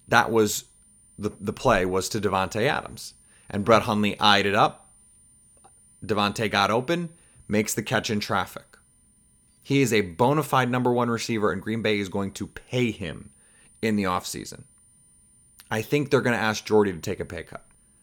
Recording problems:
high-pitched whine; faint; throughout; 9 kHz, 30 dB below the speech

